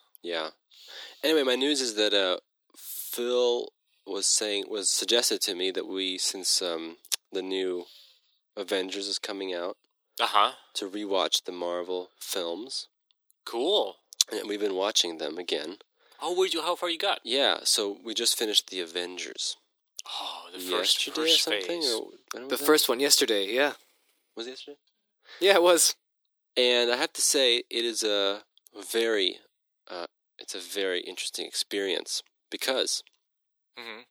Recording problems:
thin; very; fading below 300 Hz

